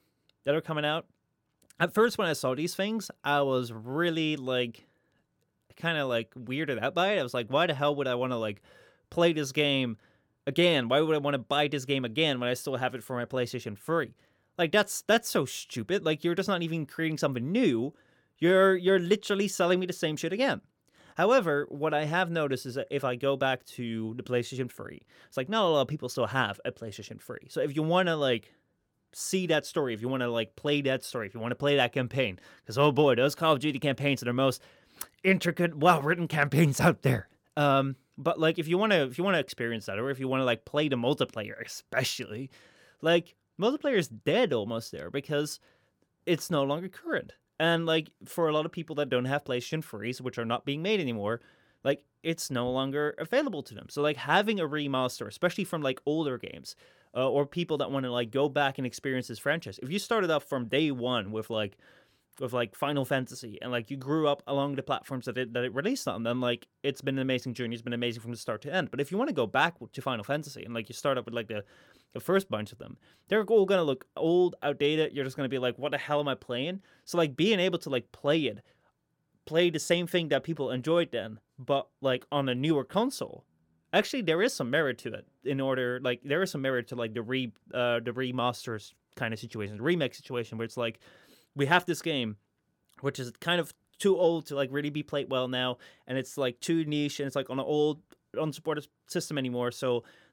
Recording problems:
none

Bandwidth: 17 kHz